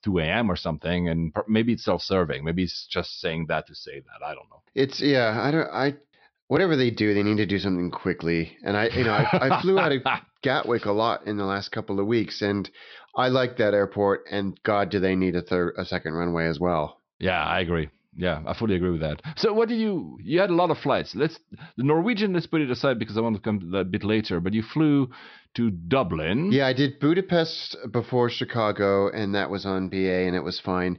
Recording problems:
high frequencies cut off; noticeable; nothing above 5.5 kHz

